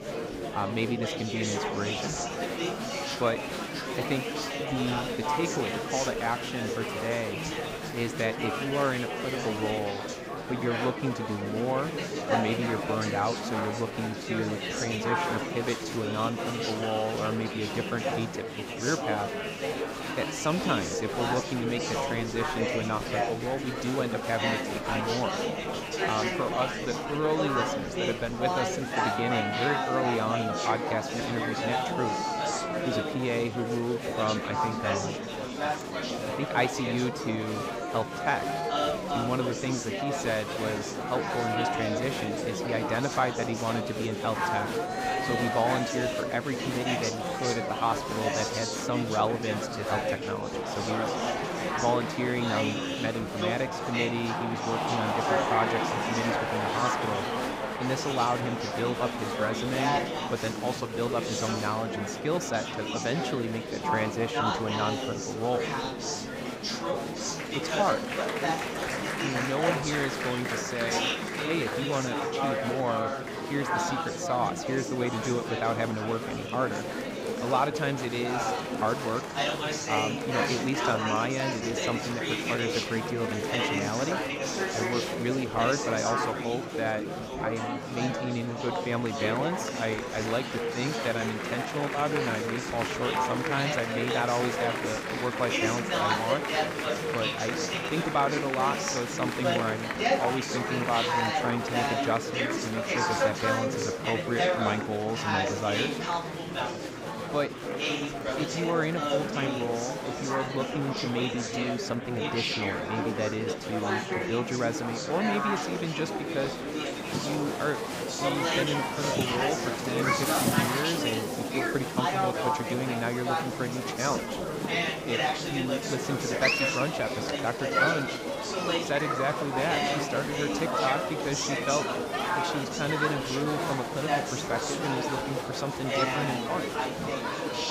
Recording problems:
murmuring crowd; very loud; throughout; 2 dB above the speech

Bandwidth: 15.5 kHz